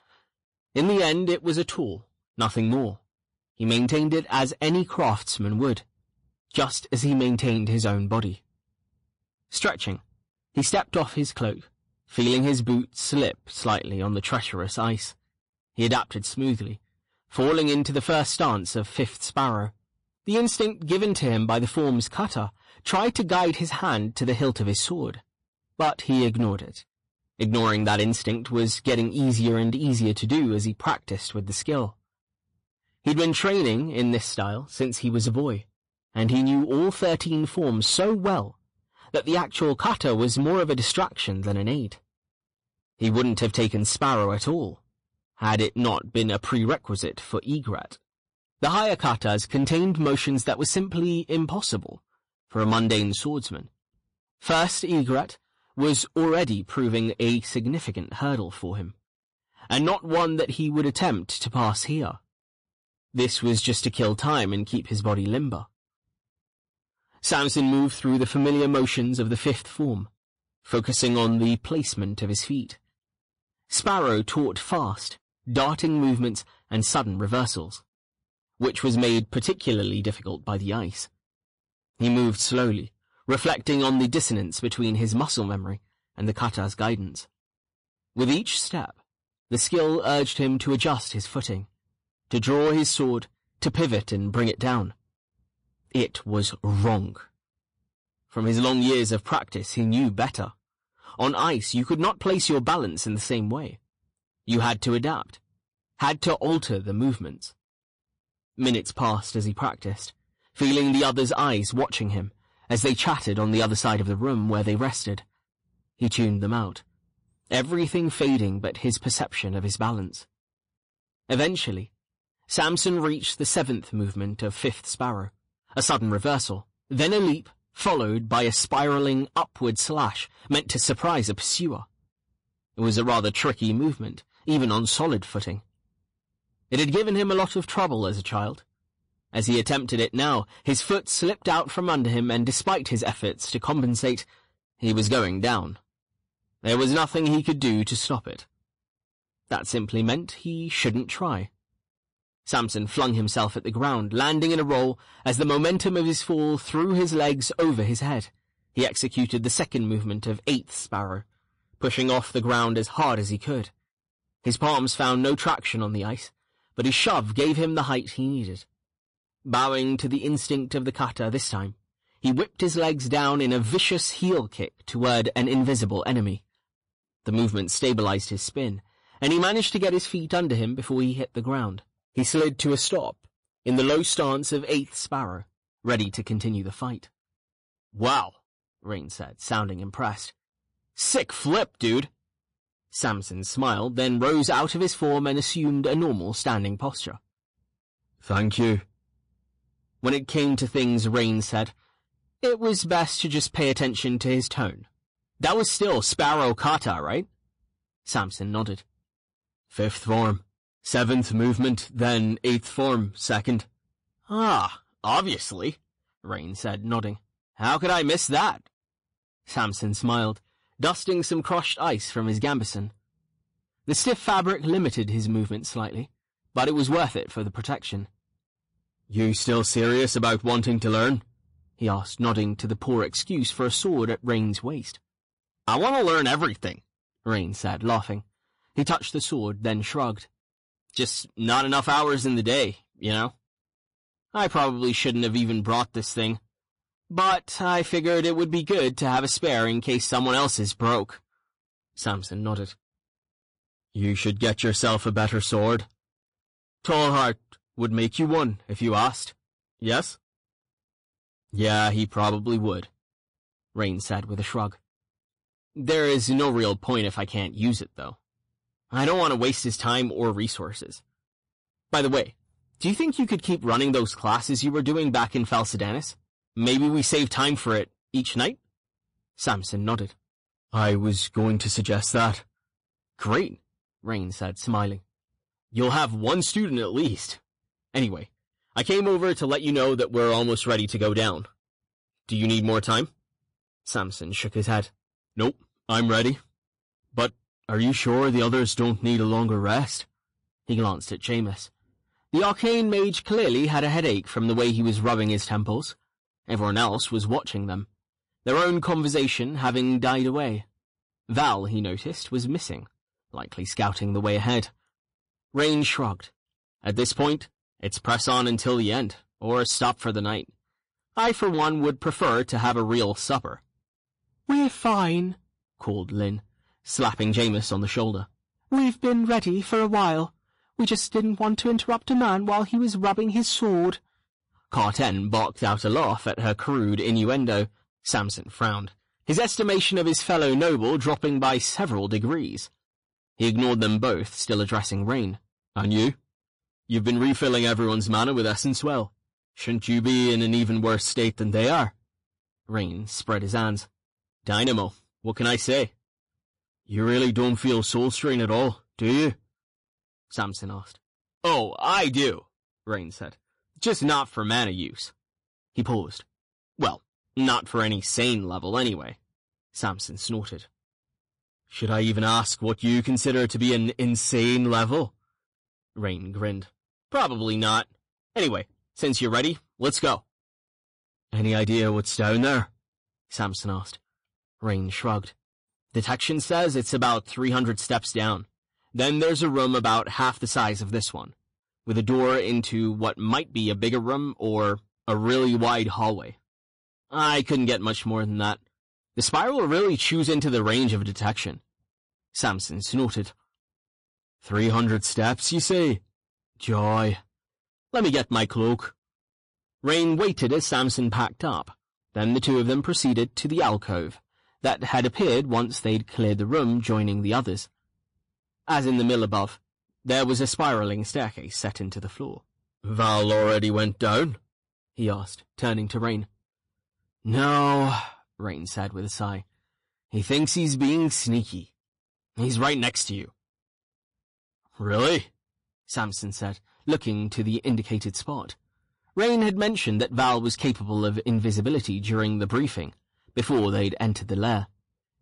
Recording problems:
distortion; slight; 7% of the sound clipped
garbled, watery; slightly; nothing above 10.5 kHz

